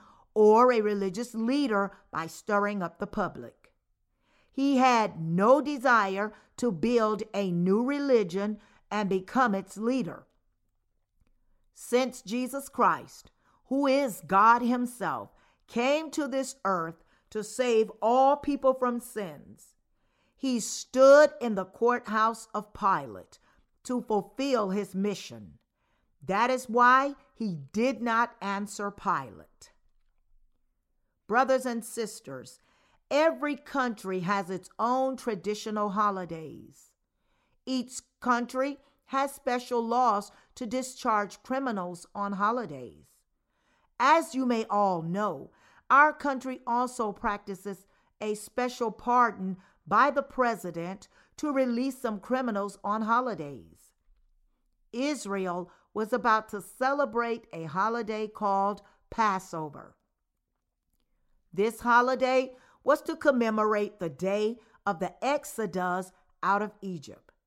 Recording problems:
none

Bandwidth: 16 kHz